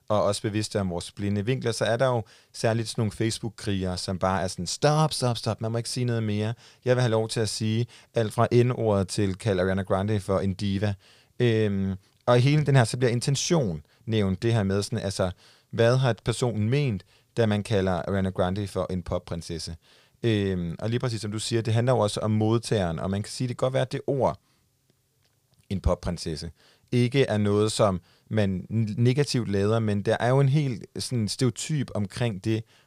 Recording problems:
none

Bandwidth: 15 kHz